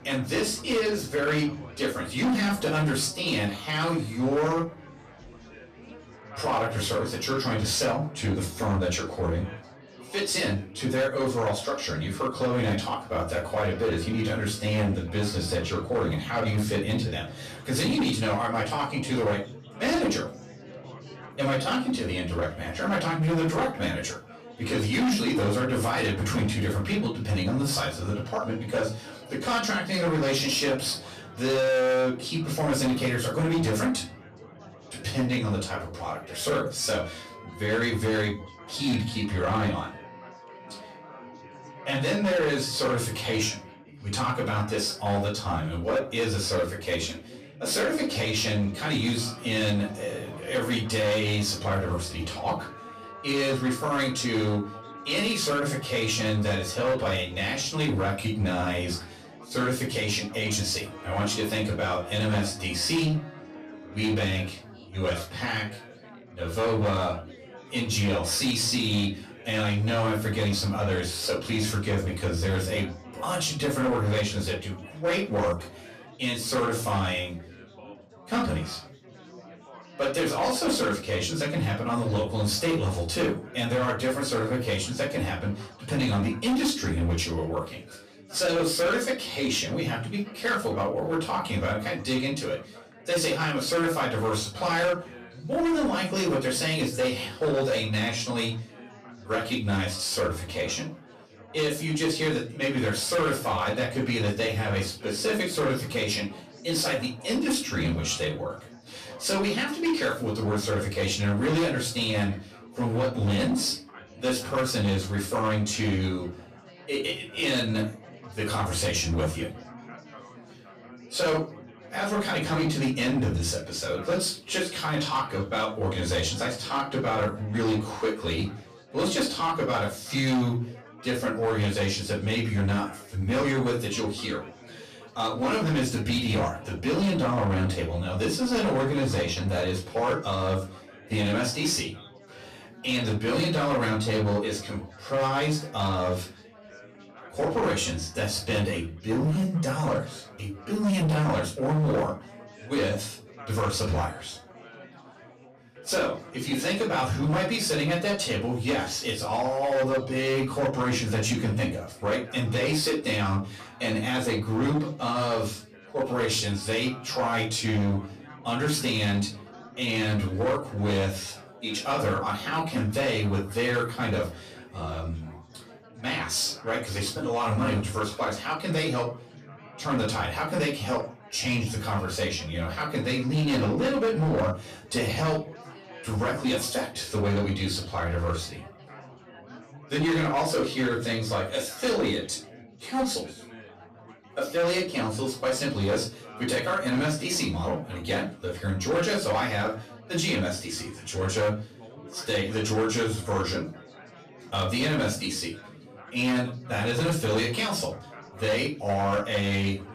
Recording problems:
off-mic speech; far
room echo; slight; dies away in 0.3 s
distortion; slight; 9% of the sound clipped
background music; faint; until 1:05; 20 dB below the speech
chatter from many people; faint; throughout; 20 dB below the speech

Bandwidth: 15 kHz